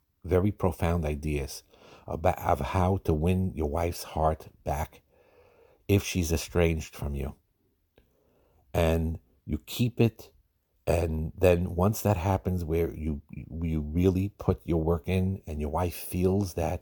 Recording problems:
none

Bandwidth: 18.5 kHz